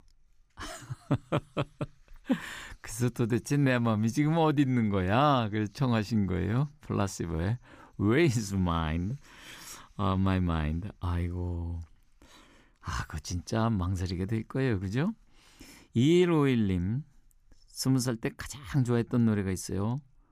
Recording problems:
none

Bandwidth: 15 kHz